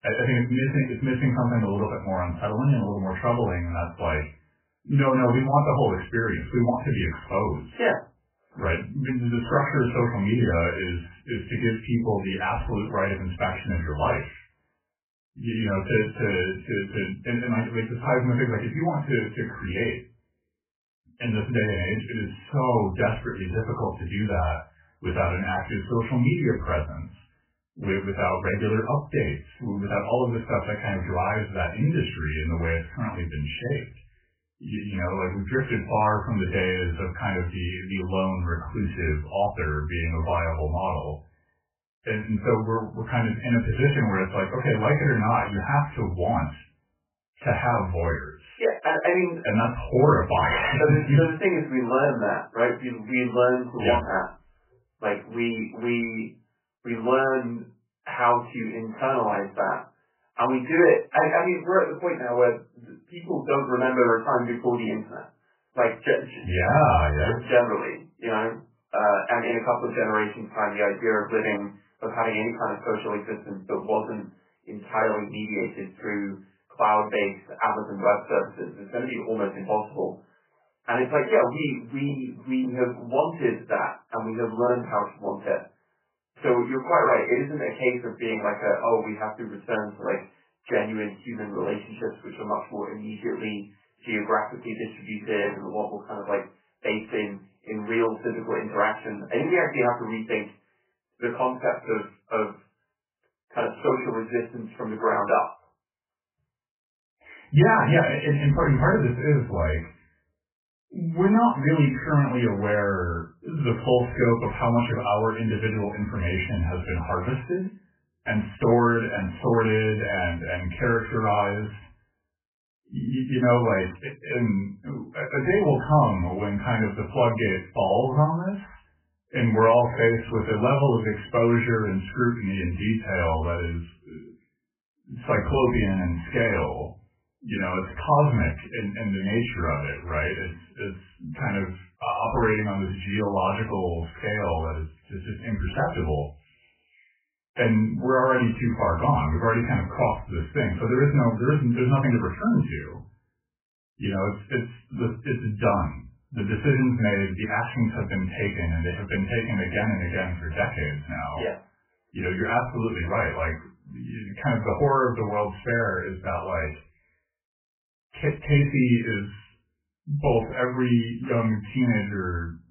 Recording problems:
off-mic speech; far
garbled, watery; badly; nothing above 3 kHz
room echo; very slight; dies away in 0.2 s

